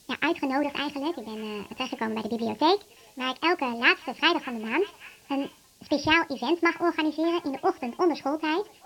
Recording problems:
wrong speed and pitch; too fast and too high; 1.5 times normal speed
high frequencies cut off; noticeable; nothing above 5.5 kHz
echo of what is said; faint; throughout; 580 ms later, 25 dB below the speech
hiss; faint; throughout; 30 dB below the speech

